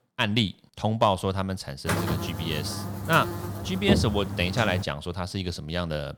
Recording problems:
electrical hum; loud; from 2 to 5 s; 50 Hz, 7 dB below the speech

